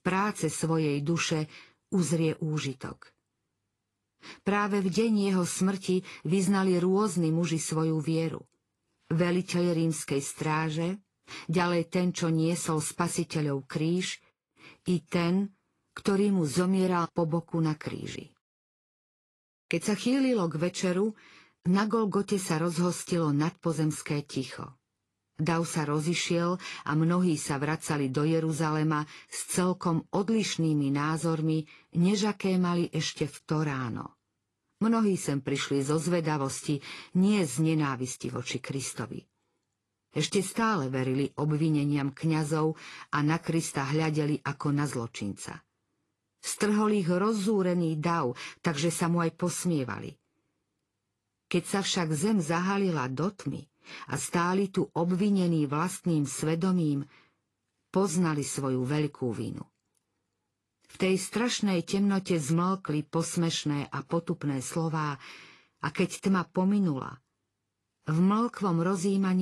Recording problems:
garbled, watery; slightly; nothing above 11.5 kHz
abrupt cut into speech; at the end

